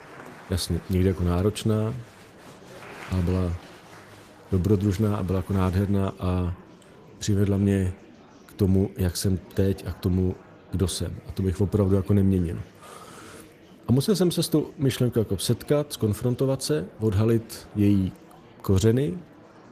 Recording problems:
garbled, watery; slightly; nothing above 14.5 kHz
murmuring crowd; faint; throughout; 20 dB below the speech

